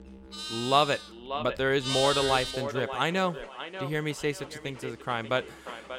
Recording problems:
echo of what is said; strong; throughout; 590 ms later, 10 dB below the speech
animal sounds; loud; throughout; 4 dB below the speech
background music; faint; throughout; 25 dB below the speech

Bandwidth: 16.5 kHz